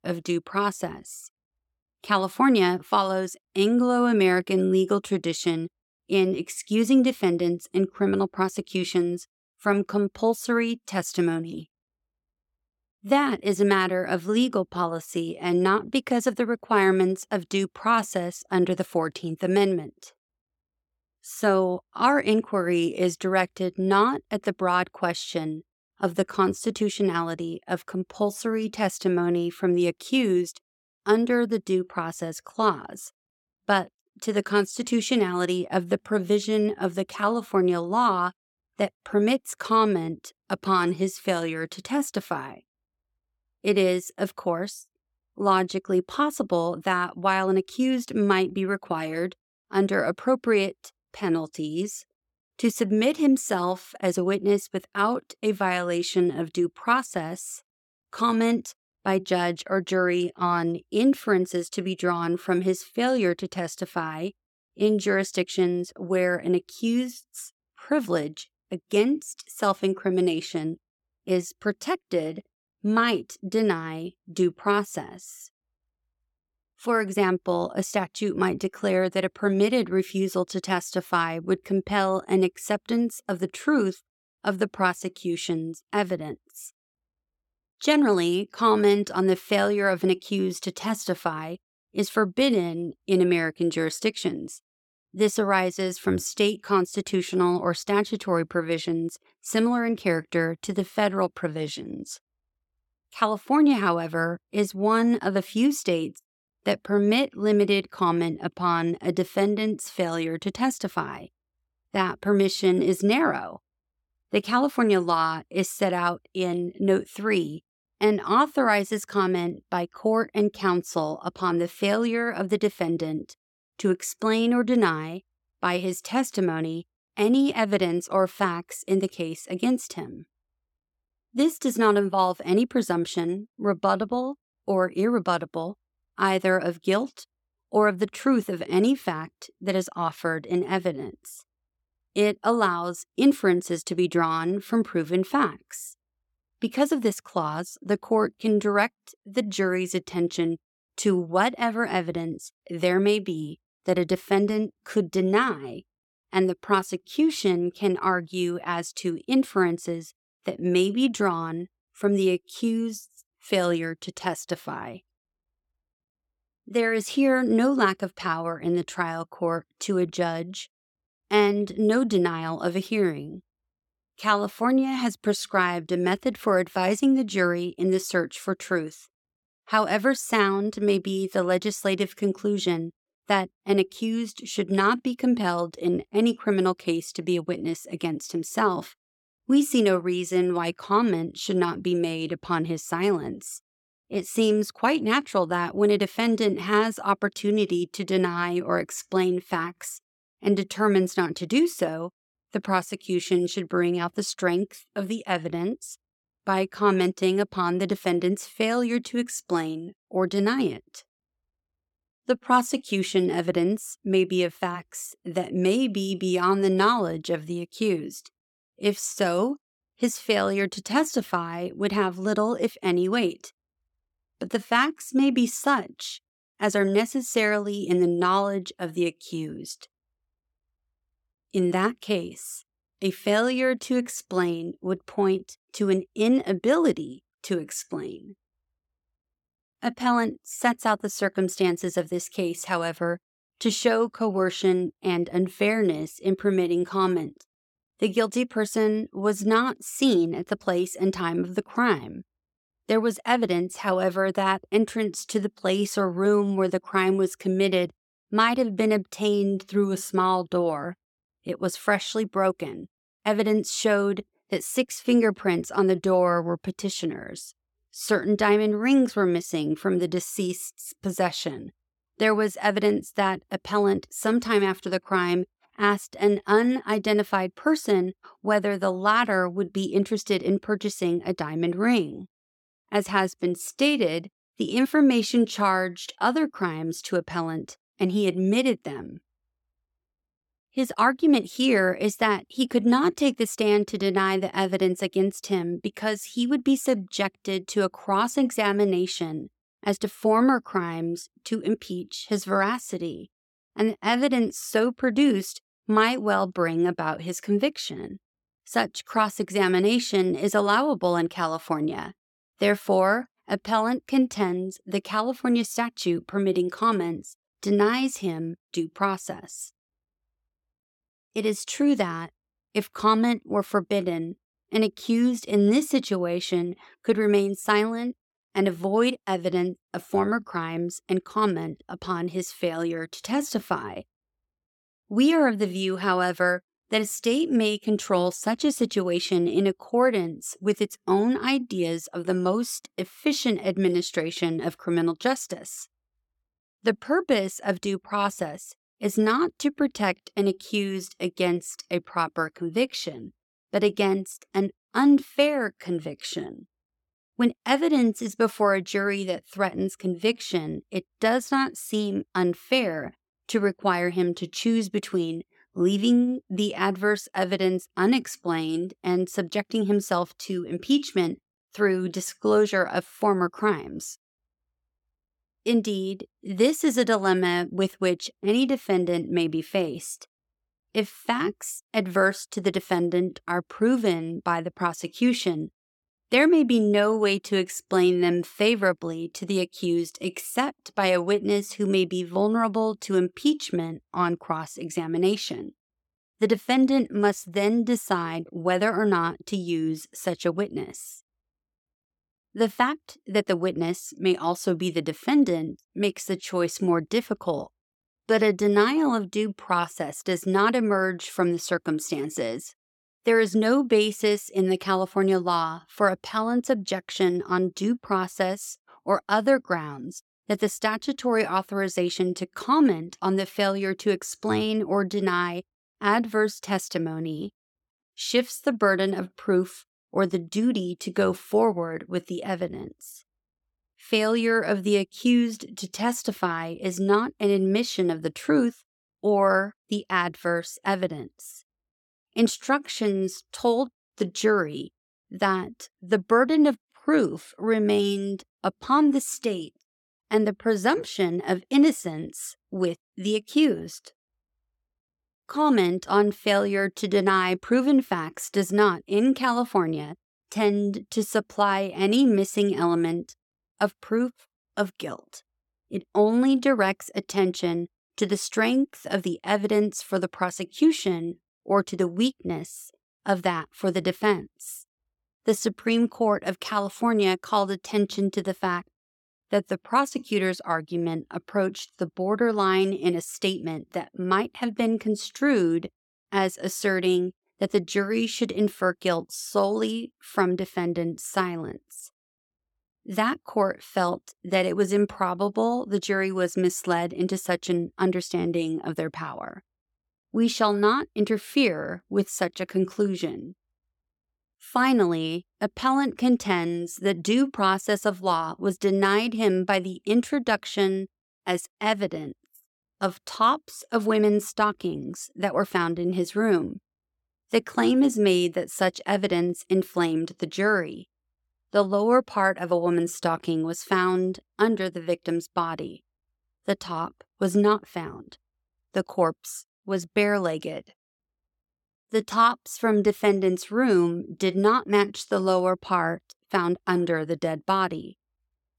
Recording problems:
none

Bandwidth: 18 kHz